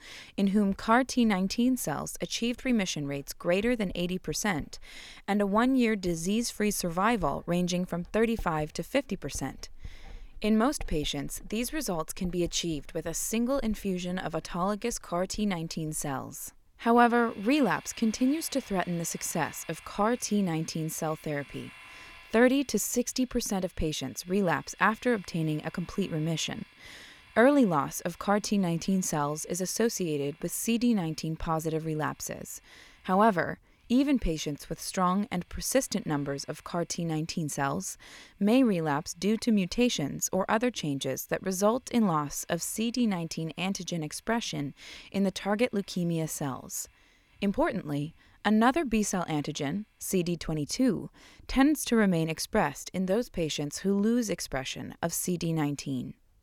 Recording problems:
household noises; faint; throughout; 25 dB below the speech

